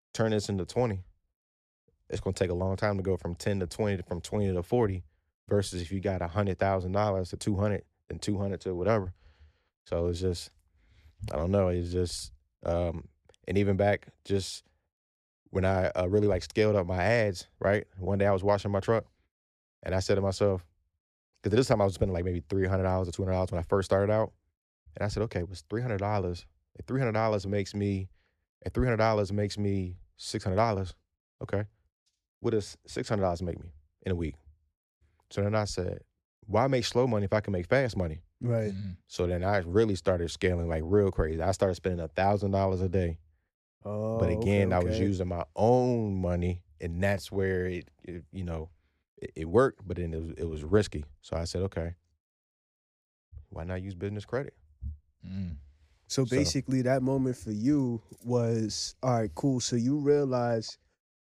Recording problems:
none

